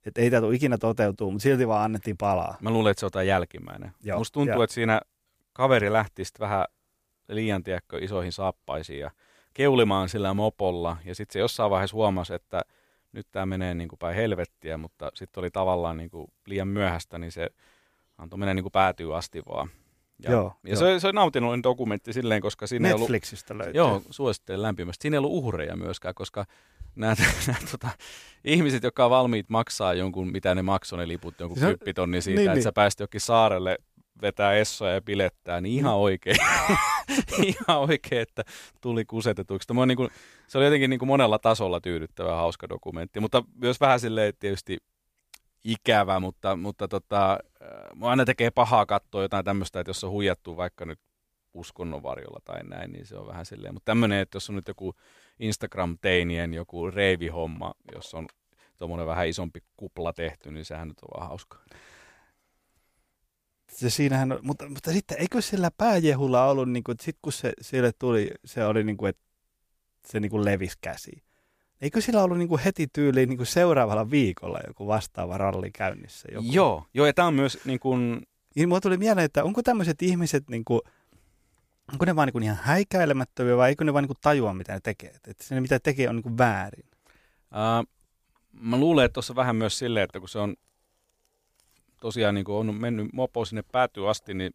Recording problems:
none

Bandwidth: 15 kHz